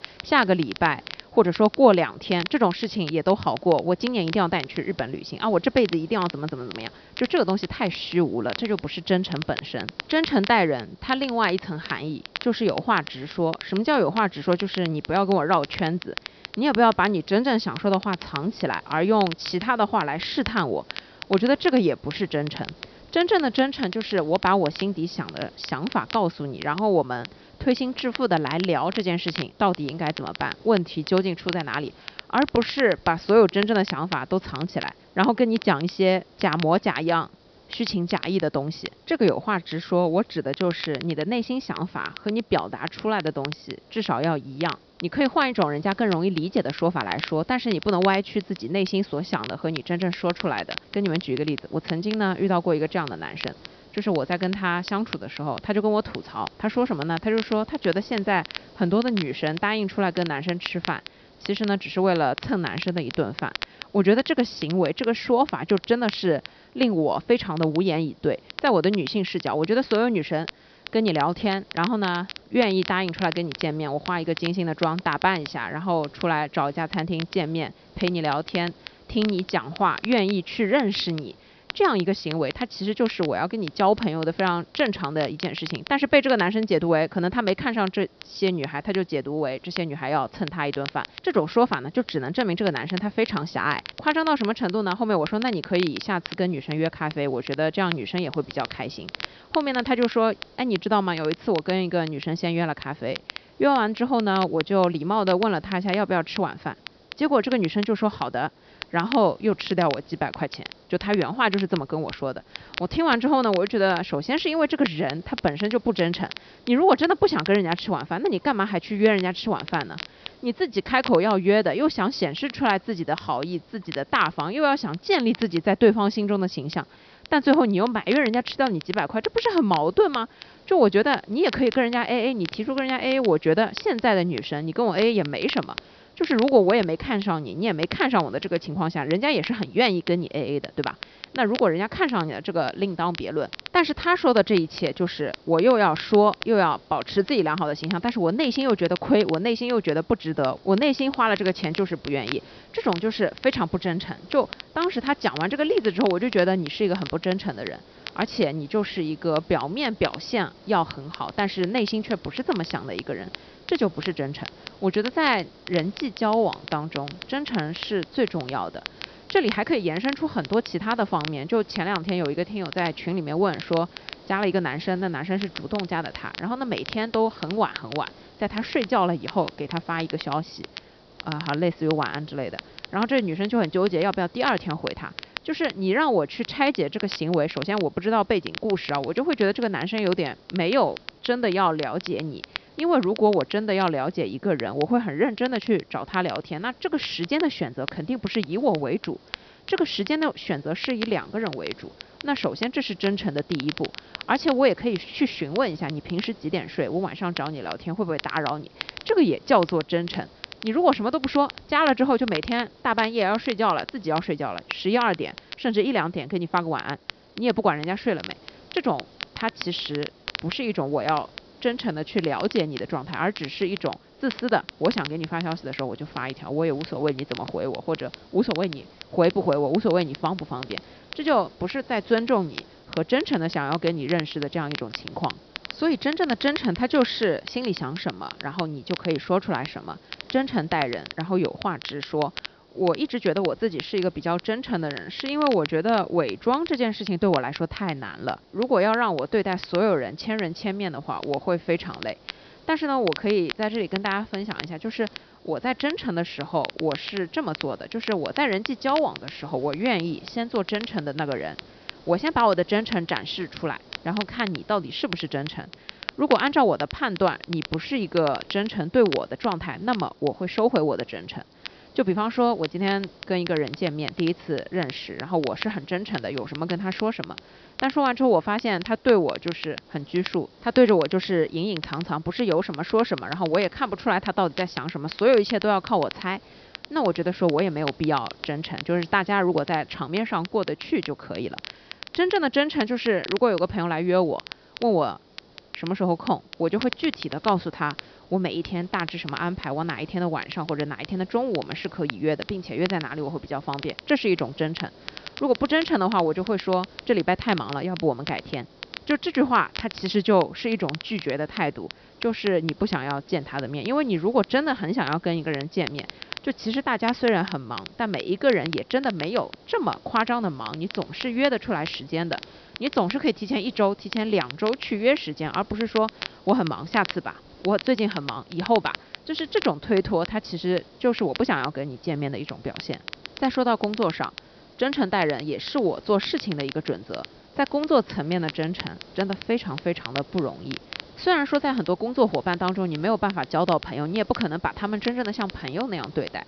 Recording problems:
high frequencies cut off; noticeable; nothing above 5.5 kHz
crackle, like an old record; noticeable; 15 dB below the speech
hiss; faint; throughout; 25 dB below the speech

